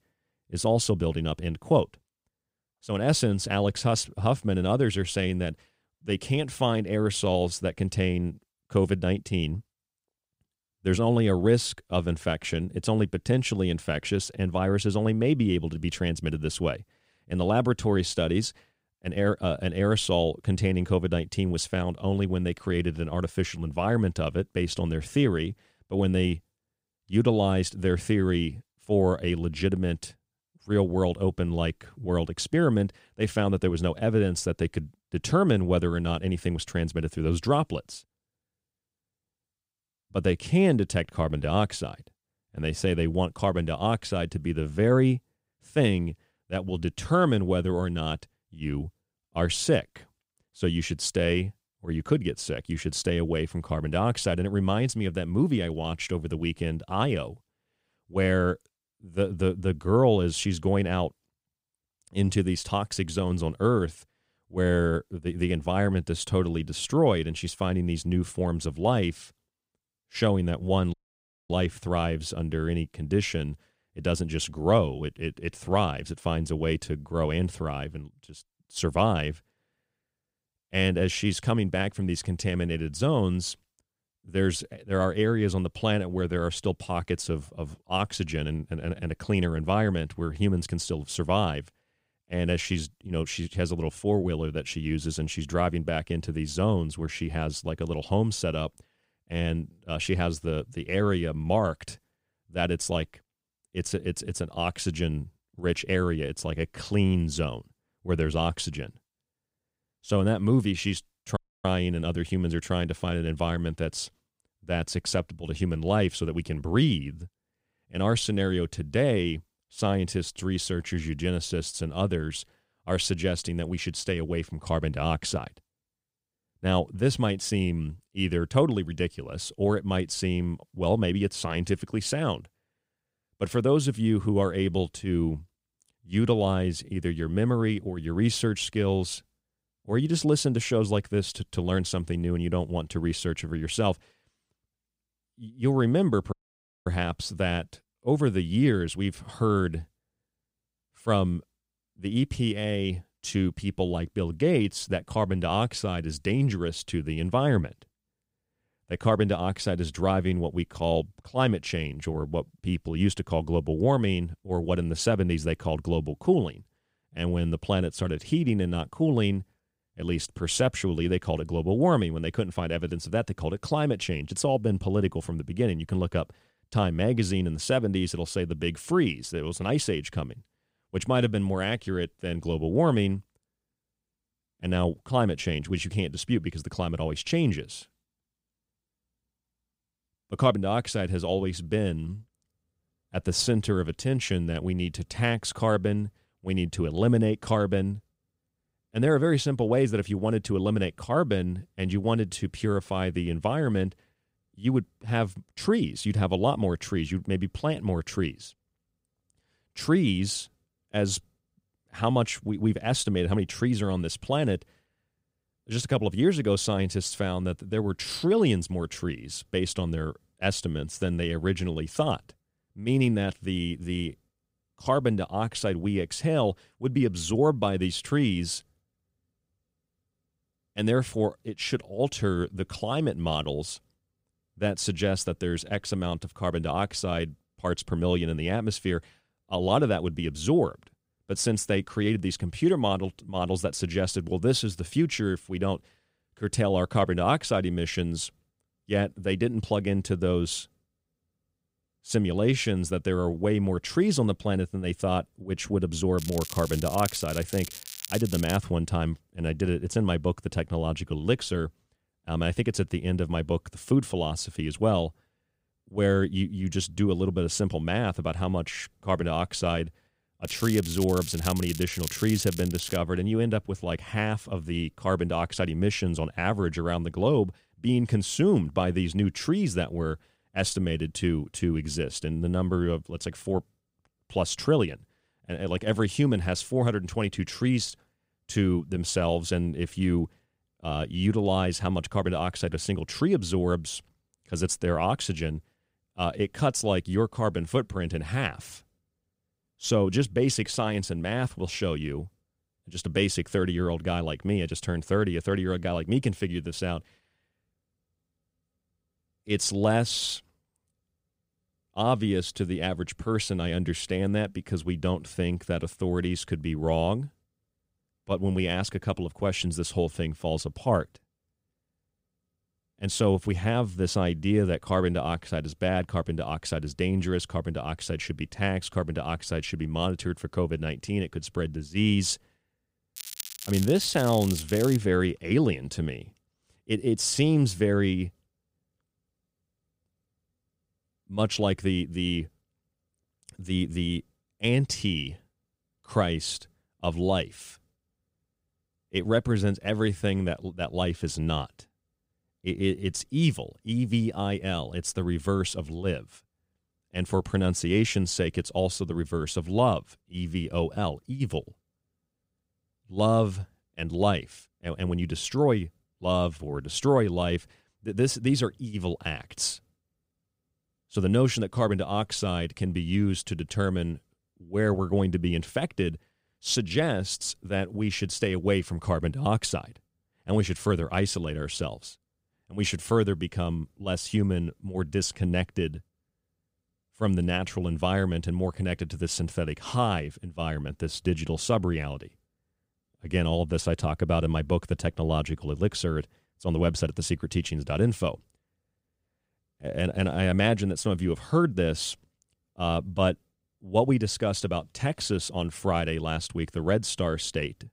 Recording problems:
crackling; loud; from 4:16 to 4:19, from 4:30 to 4:33 and from 5:33 to 5:35; 10 dB below the speech
audio cutting out; at 1:11 for 0.5 s, at 1:51 and at 2:26 for 0.5 s

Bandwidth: 15.5 kHz